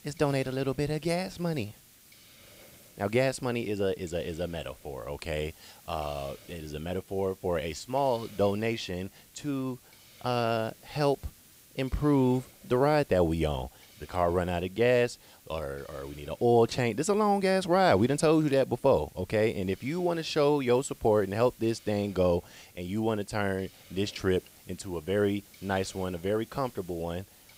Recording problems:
hiss; faint; throughout; 25 dB below the speech

